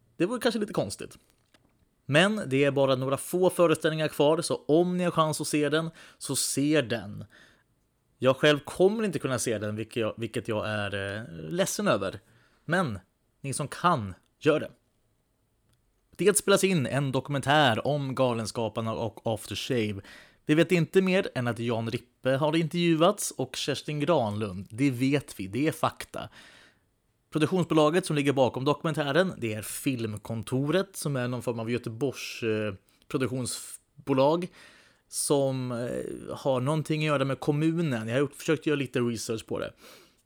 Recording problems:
none

